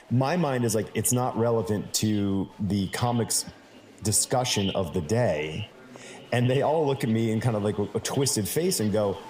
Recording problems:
echo of what is said; noticeable; throughout; 90 ms later, 15 dB below the speech
murmuring crowd; faint; throughout; 25 dB below the speech

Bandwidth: 15.5 kHz